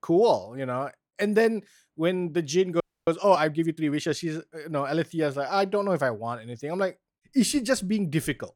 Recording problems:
audio freezing; at 3 s

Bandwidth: 18 kHz